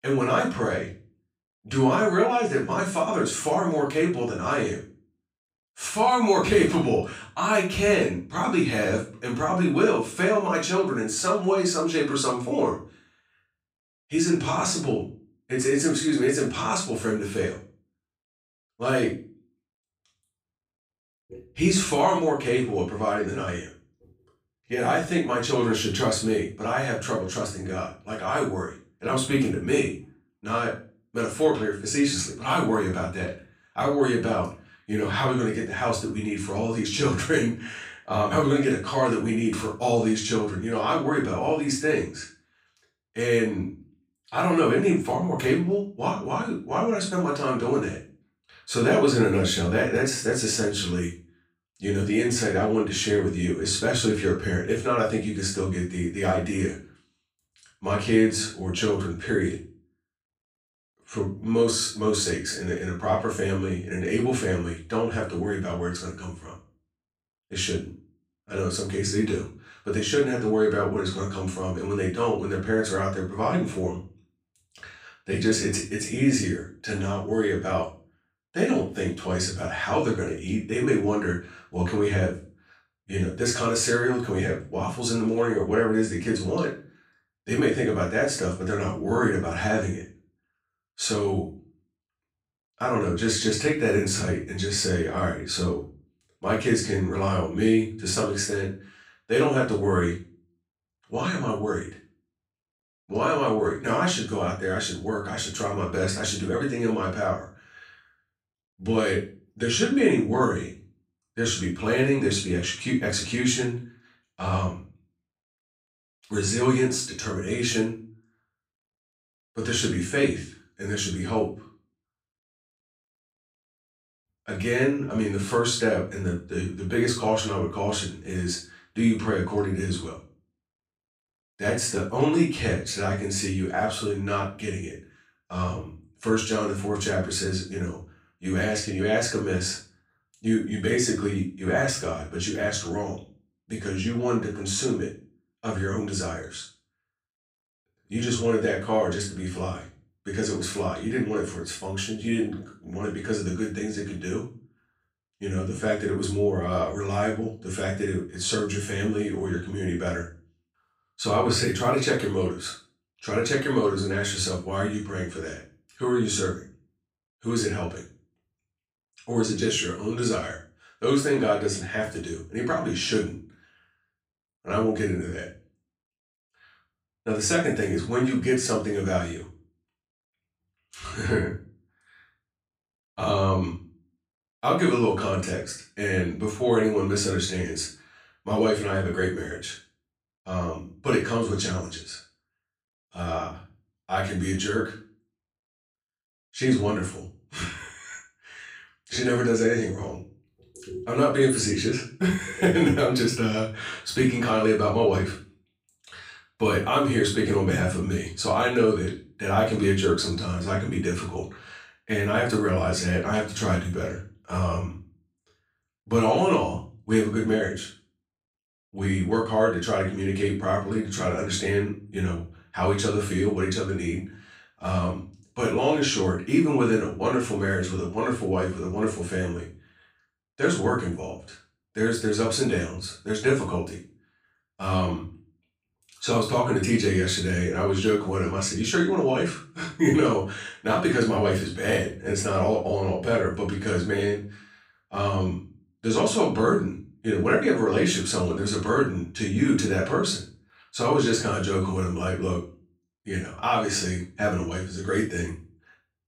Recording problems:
off-mic speech; far
room echo; slight; dies away in 0.3 s

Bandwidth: 15.5 kHz